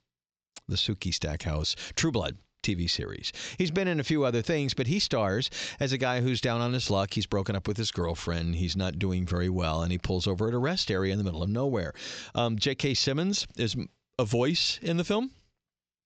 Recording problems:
high frequencies cut off; noticeable; nothing above 8 kHz

